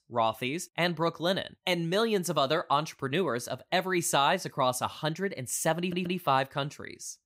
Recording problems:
audio stuttering; at 6 s

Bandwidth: 15.5 kHz